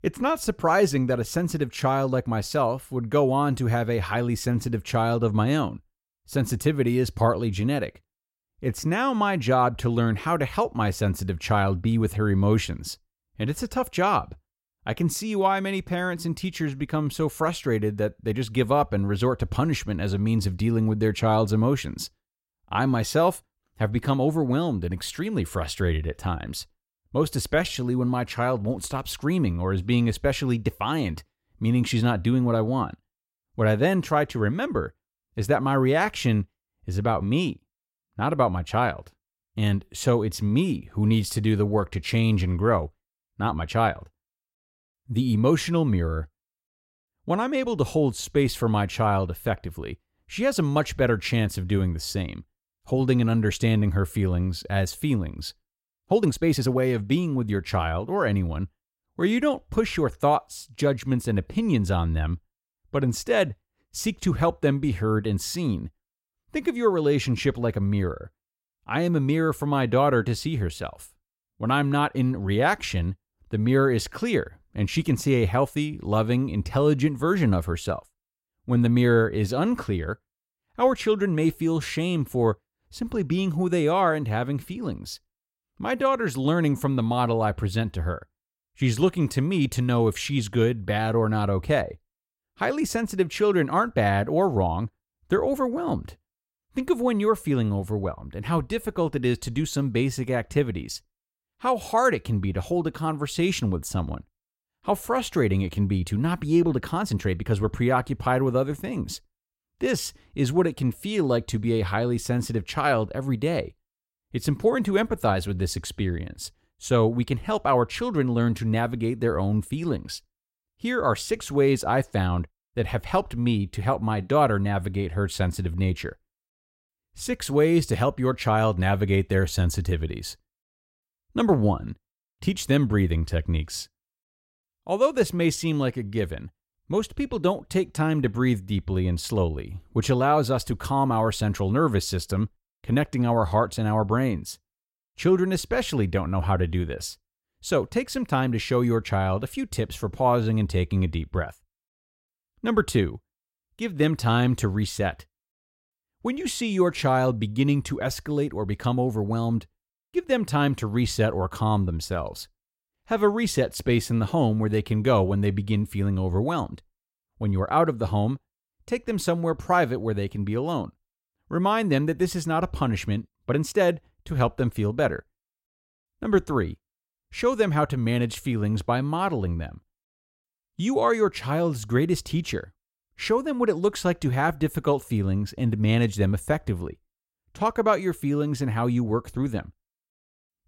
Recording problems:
uneven, jittery; strongly; from 28 s to 2:54

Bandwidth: 16 kHz